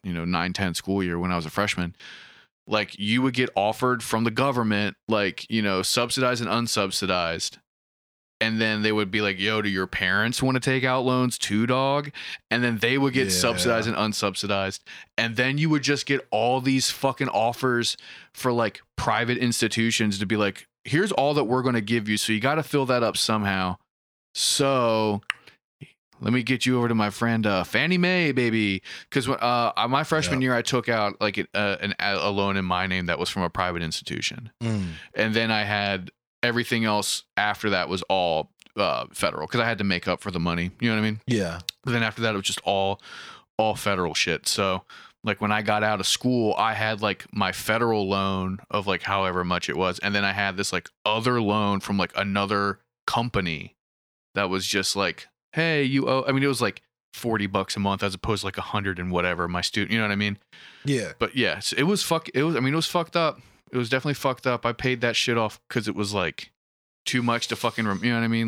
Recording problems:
abrupt cut into speech; at the end

